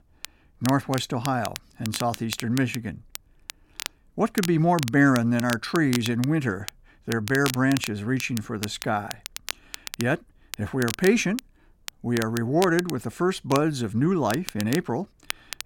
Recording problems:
crackle, like an old record; noticeable; 10 dB below the speech

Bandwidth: 16.5 kHz